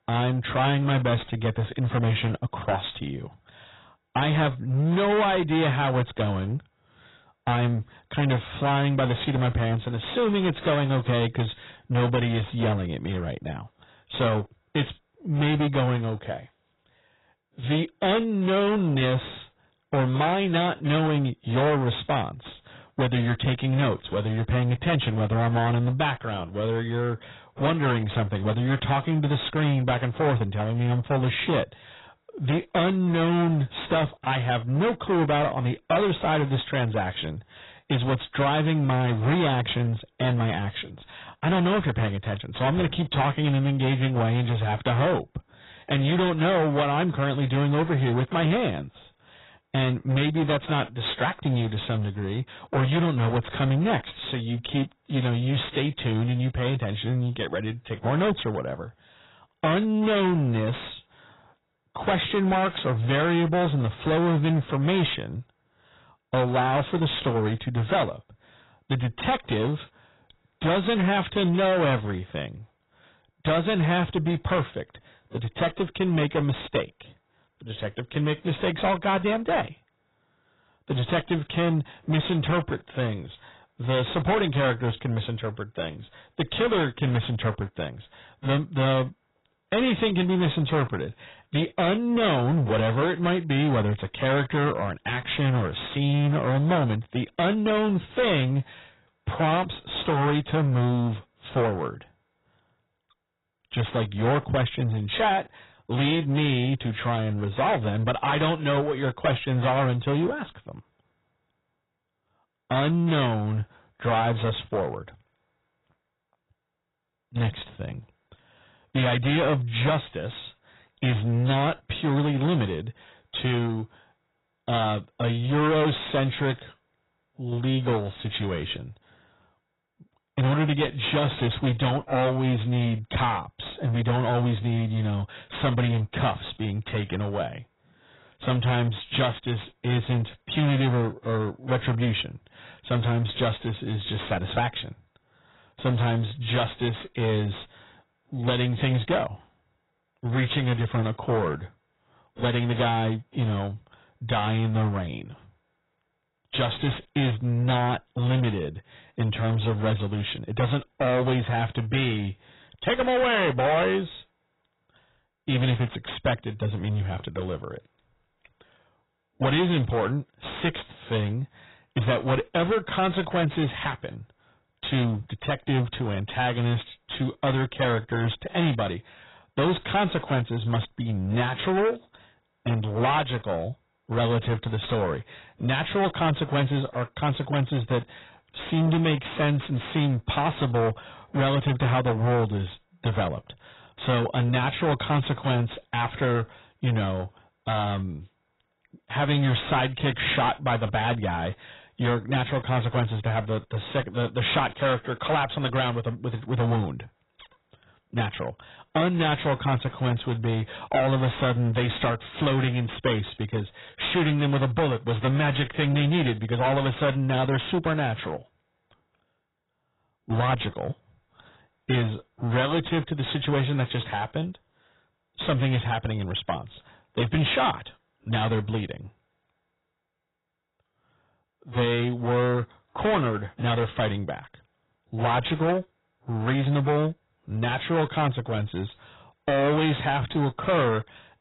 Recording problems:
distortion; heavy; 16% of the sound clipped
garbled, watery; badly; nothing above 4 kHz

